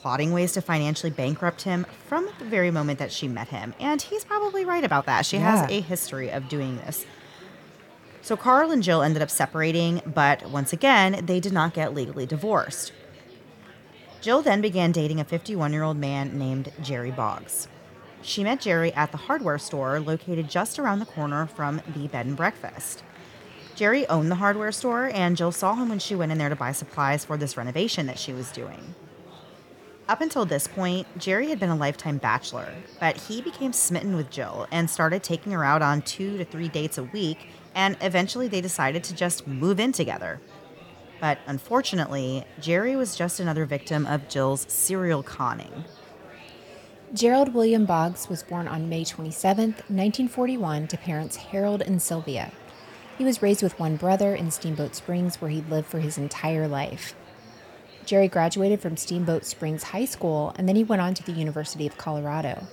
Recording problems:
murmuring crowd; faint; throughout; 20 dB below the speech

